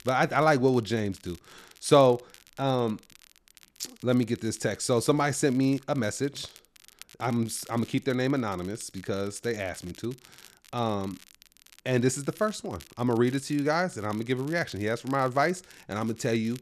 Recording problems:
crackle, like an old record; faint; 25 dB below the speech

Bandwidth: 13.5 kHz